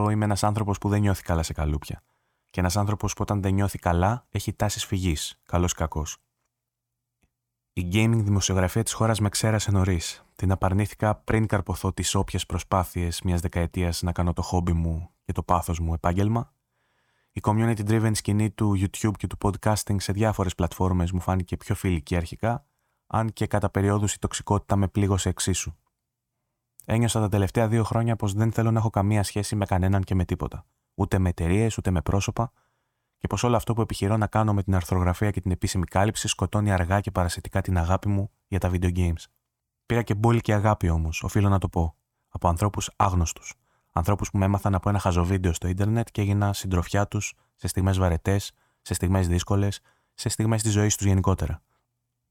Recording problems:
abrupt cut into speech; at the start

